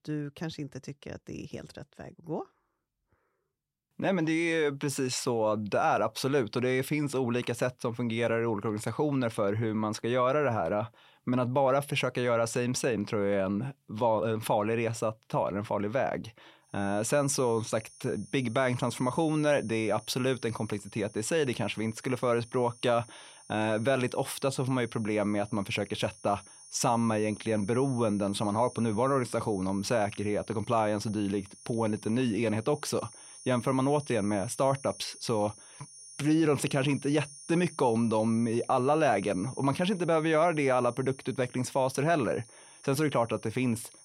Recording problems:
high-pitched whine; noticeable; from 17 s on; 9.5 kHz, 20 dB below the speech

